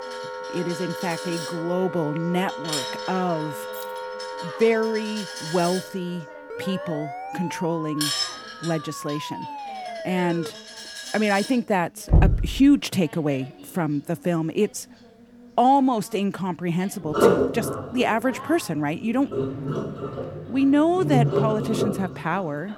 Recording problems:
household noises; loud; throughout; 4 dB below the speech
background music; noticeable; throughout; 10 dB below the speech
voice in the background; faint; throughout; 20 dB below the speech
jangling keys; faint; at 3.5 s; peak 15 dB below the speech
siren; noticeable; from 6.5 to 11 s; peak 9 dB below the speech
door banging; loud; at 12 s; peak 5 dB above the speech

